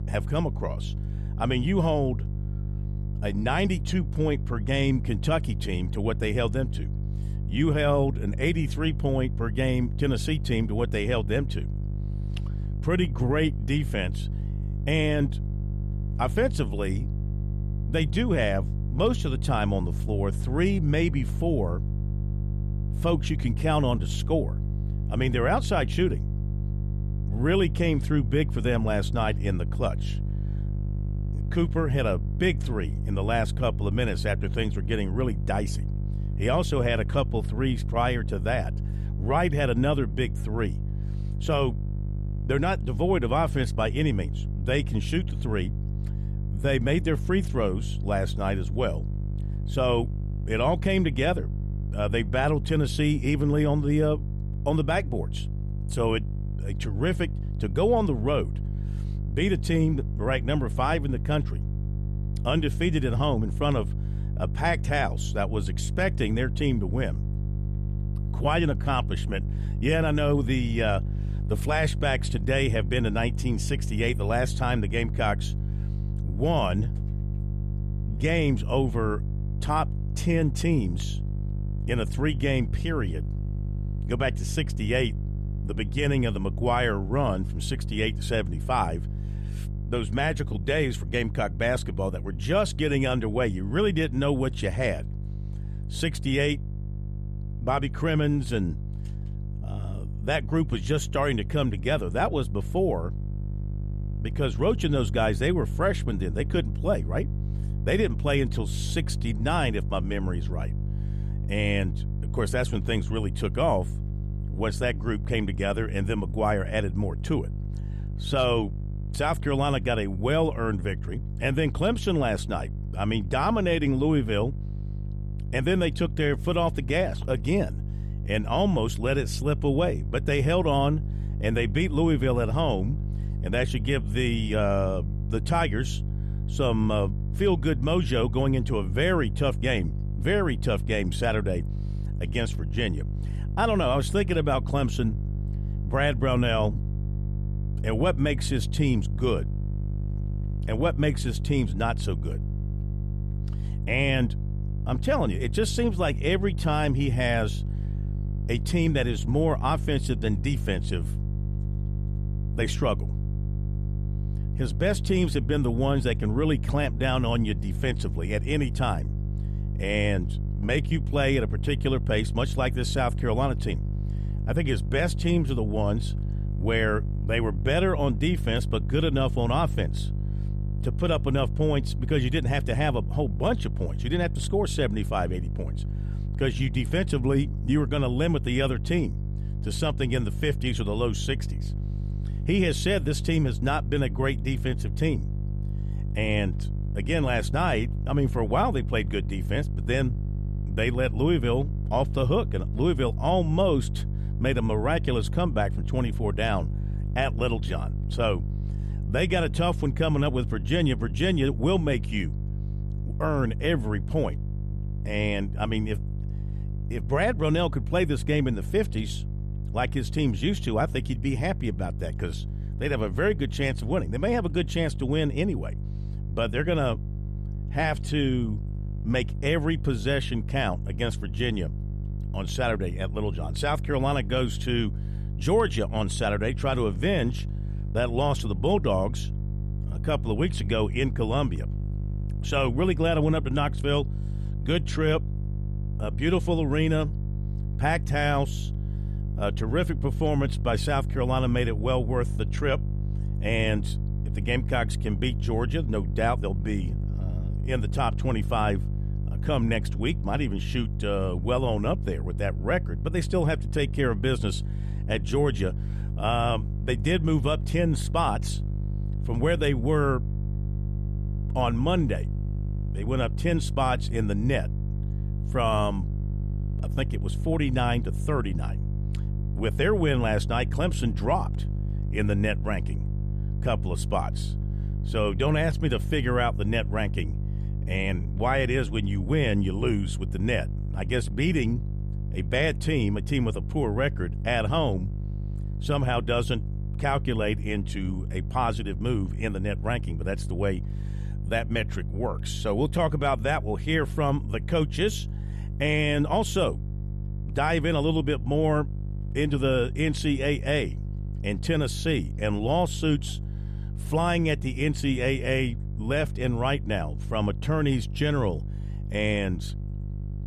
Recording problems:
electrical hum; noticeable; throughout; 50 Hz, 15 dB below the speech

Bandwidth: 14.5 kHz